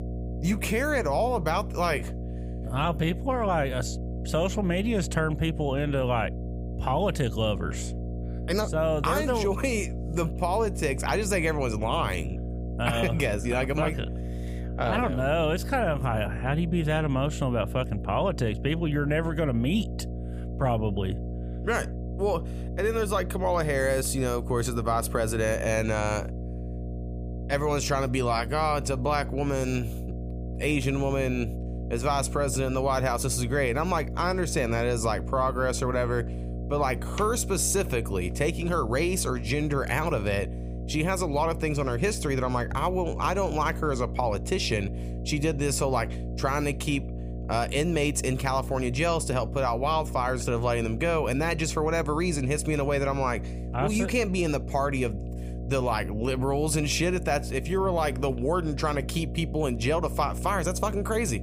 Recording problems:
electrical hum; noticeable; throughout; 60 Hz, 15 dB below the speech

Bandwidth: 15 kHz